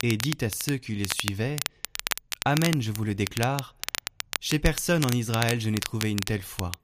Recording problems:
crackle, like an old record; loud; 5 dB below the speech

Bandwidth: 15 kHz